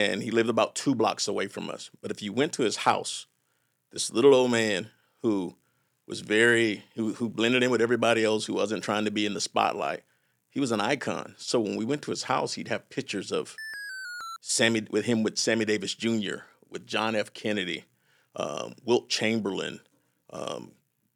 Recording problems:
abrupt cut into speech; at the start
alarm; noticeable; at 14 s; peak 9 dB below the speech

